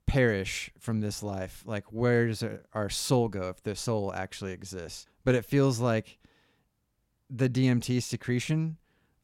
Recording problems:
none

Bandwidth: 16.5 kHz